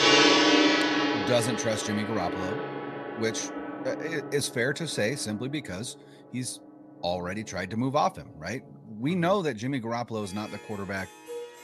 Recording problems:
background music; very loud; throughout; 5 dB above the speech

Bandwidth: 14 kHz